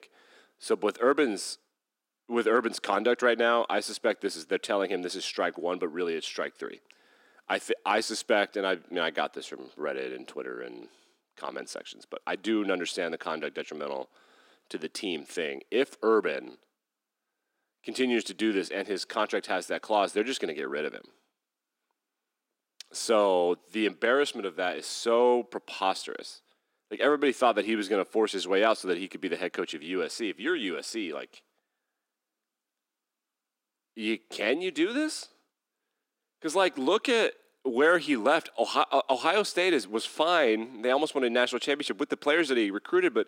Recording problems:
thin; somewhat; fading below 250 Hz

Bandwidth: 16 kHz